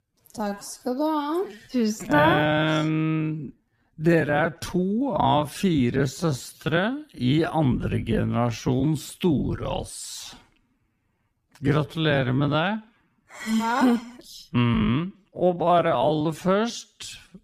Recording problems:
wrong speed, natural pitch; too slow; 0.5 times normal speed

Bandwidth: 14.5 kHz